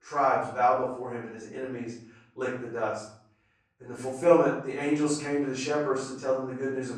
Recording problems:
off-mic speech; far
room echo; noticeable; dies away in 0.6 s

